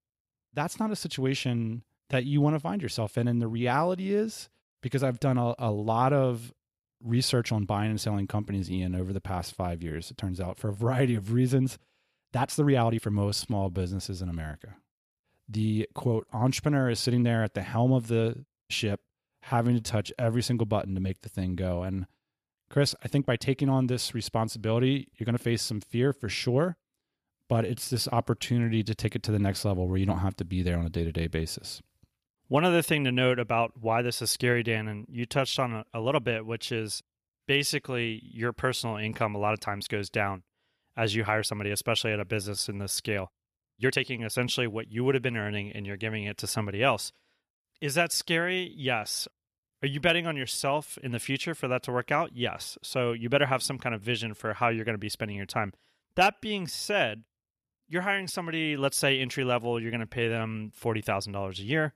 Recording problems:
uneven, jittery; strongly; from 2 s to 1:01

